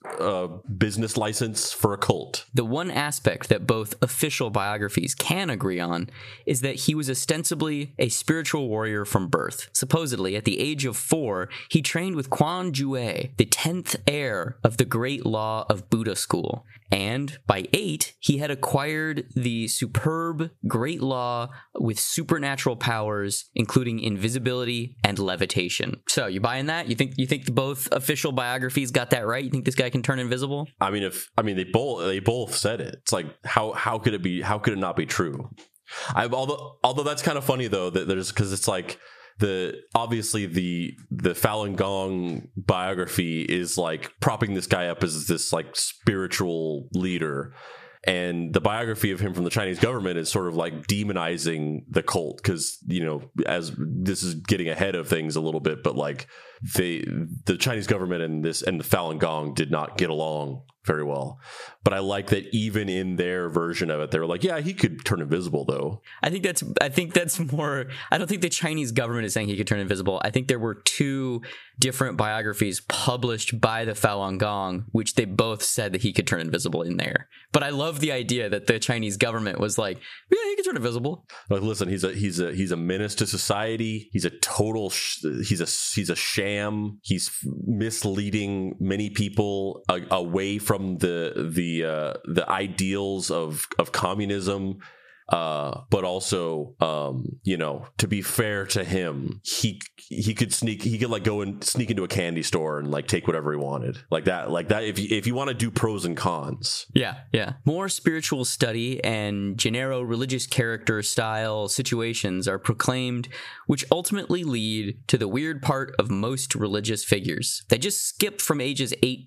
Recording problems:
squashed, flat; somewhat

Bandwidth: 14.5 kHz